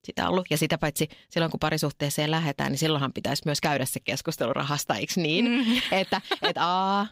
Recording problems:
none

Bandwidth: 15.5 kHz